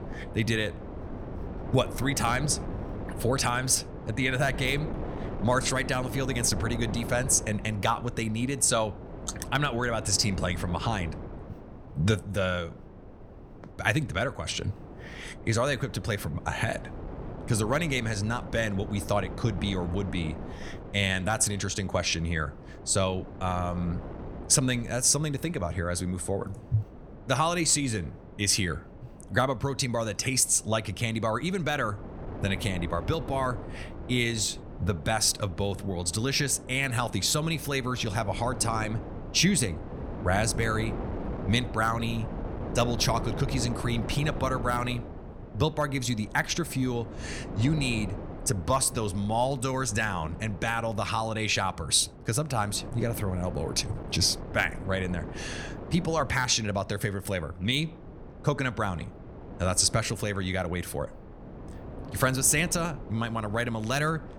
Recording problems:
wind noise on the microphone; occasional gusts; 15 dB below the speech

